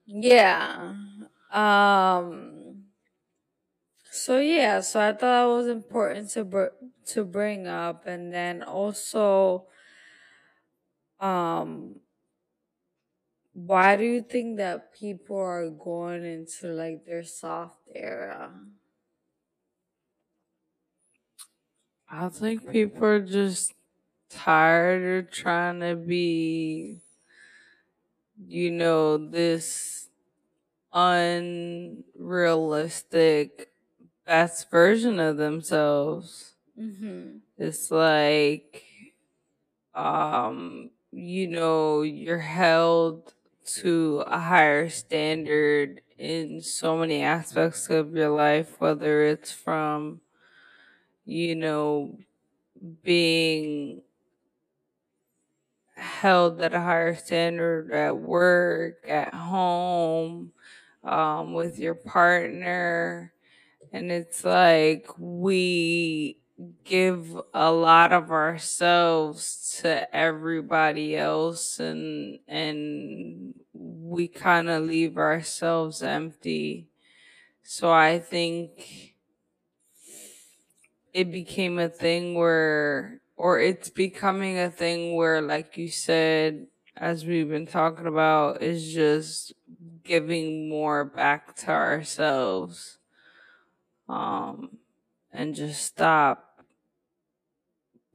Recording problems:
wrong speed, natural pitch; too slow; 0.6 times normal speed

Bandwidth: 14.5 kHz